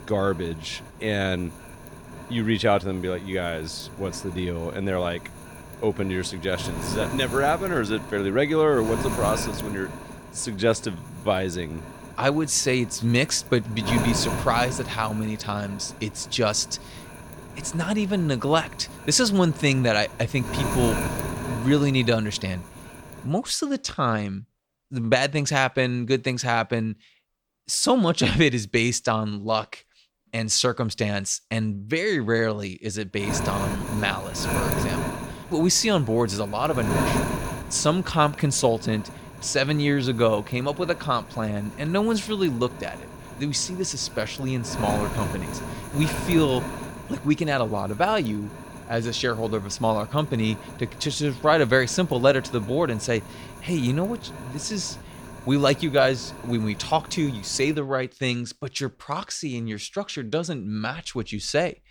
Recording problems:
wind noise on the microphone; occasional gusts; until 23 s and from 33 to 58 s; 10 dB below the speech

